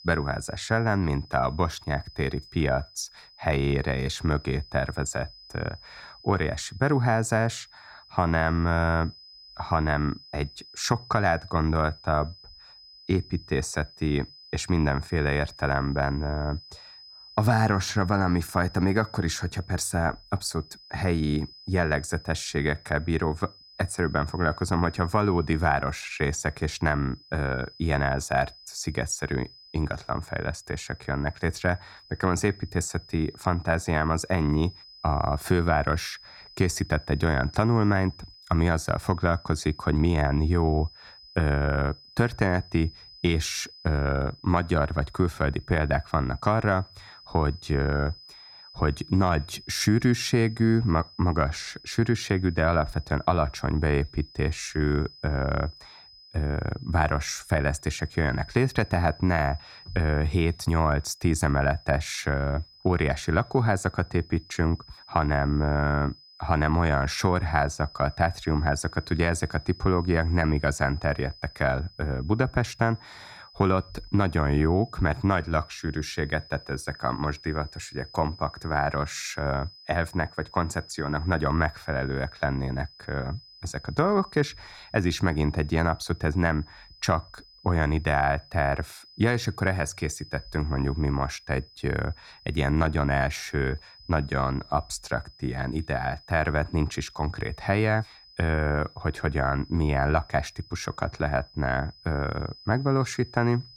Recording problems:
high-pitched whine; faint; throughout; 5 kHz, 20 dB below the speech

